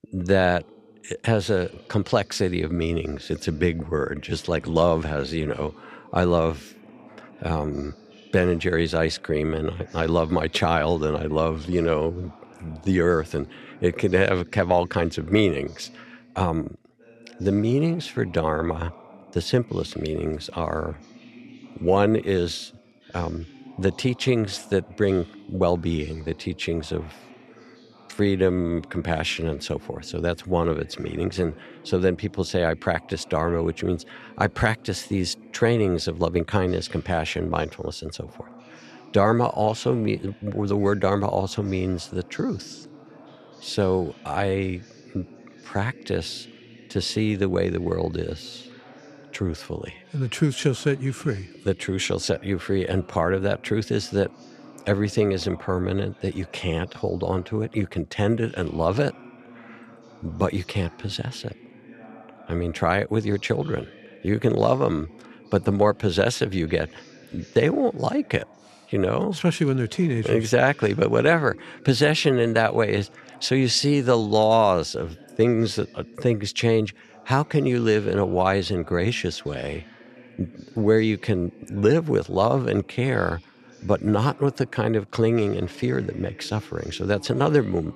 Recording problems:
voice in the background; faint; throughout; 25 dB below the speech

